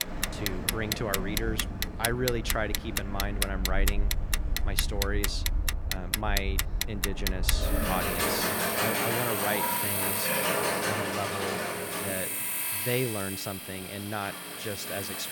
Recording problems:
animal sounds; very loud; throughout; 2 dB above the speech
household noises; very loud; throughout; 2 dB above the speech

